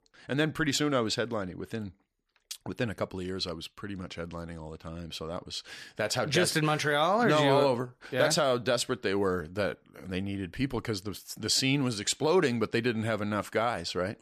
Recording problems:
none

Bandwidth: 14 kHz